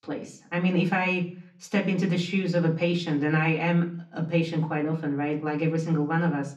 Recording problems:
off-mic speech; far
room echo; very slight; dies away in 0.4 s

